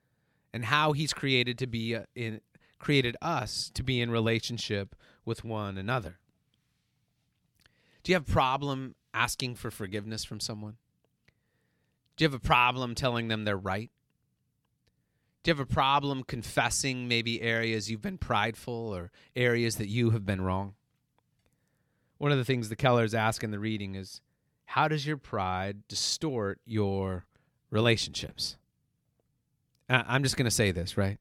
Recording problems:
none

